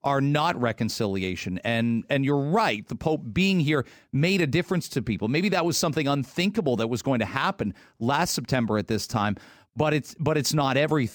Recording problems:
none

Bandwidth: 18 kHz